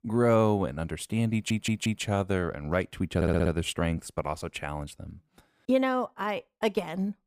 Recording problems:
audio stuttering; at 1.5 s and at 3 s

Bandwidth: 15 kHz